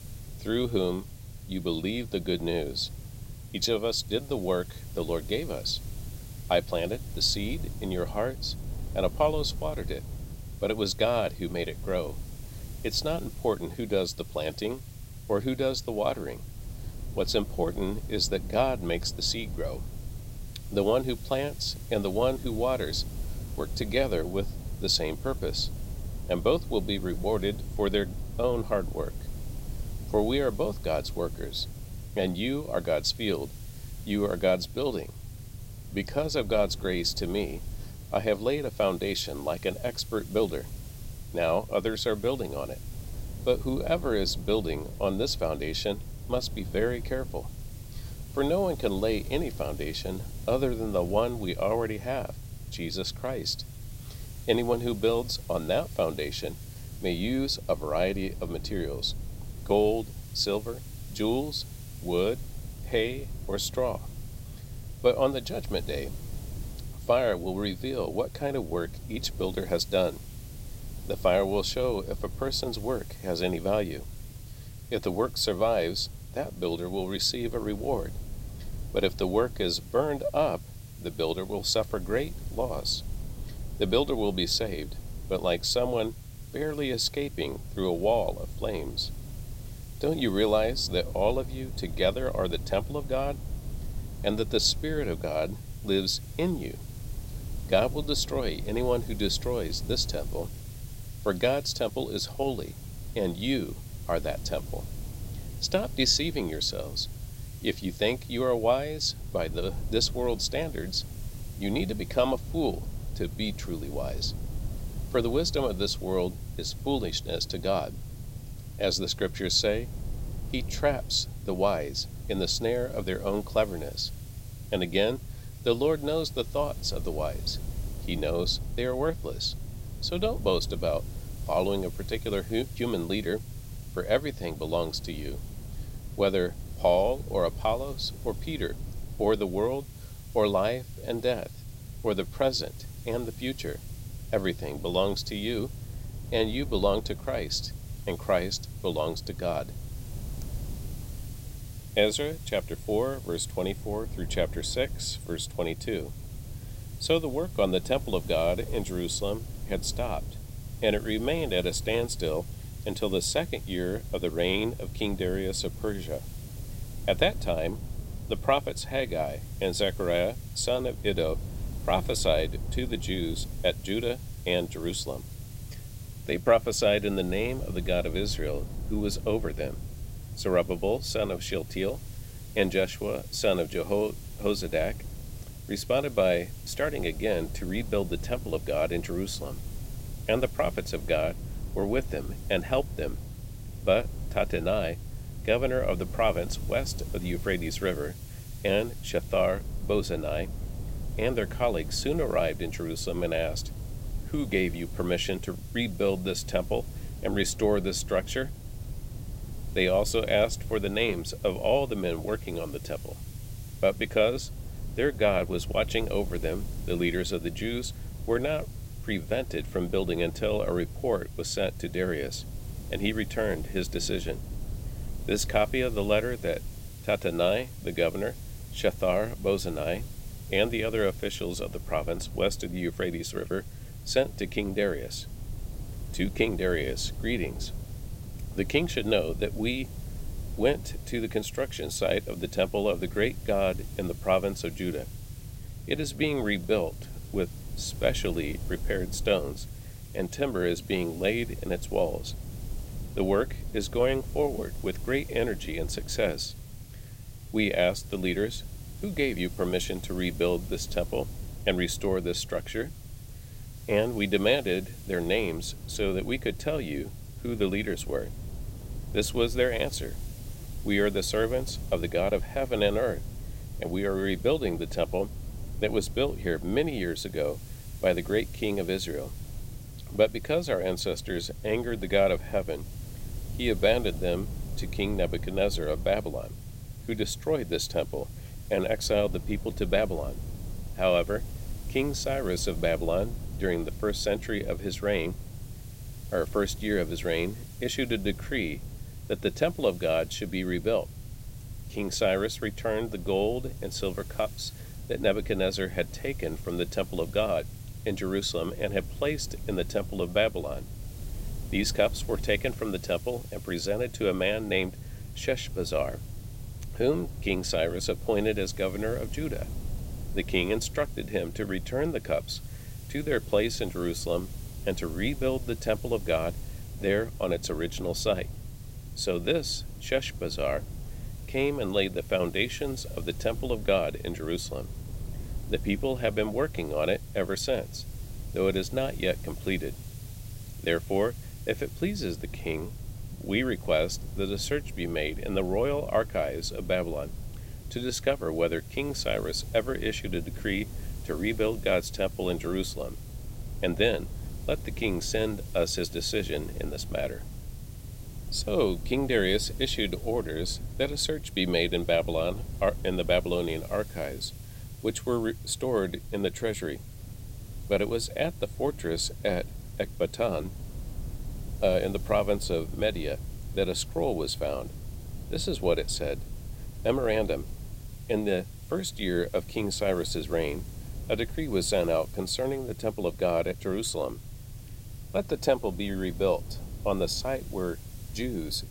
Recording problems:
hiss; faint; throughout; 20 dB below the speech
low rumble; faint; throughout; 25 dB below the speech

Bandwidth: 16 kHz